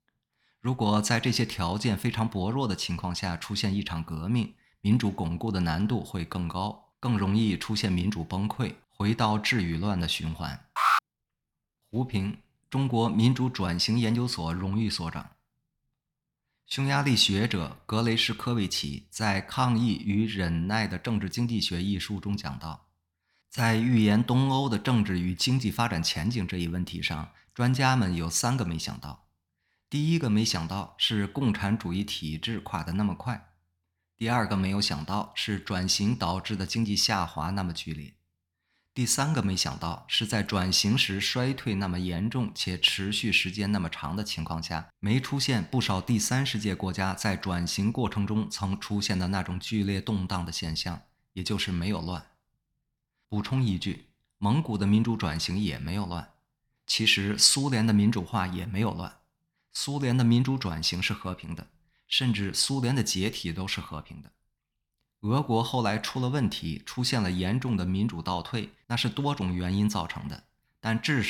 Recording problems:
alarm; loud; at 11 s; peak 4 dB above the speech
abrupt cut into speech; at the end

